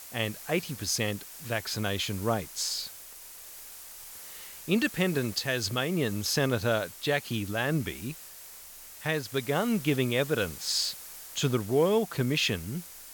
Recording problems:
hiss; noticeable; throughout; 15 dB below the speech

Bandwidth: 18 kHz